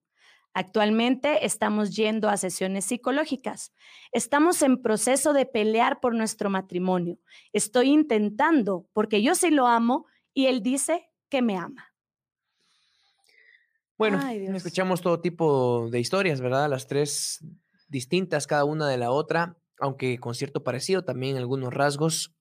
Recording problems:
none

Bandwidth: 15 kHz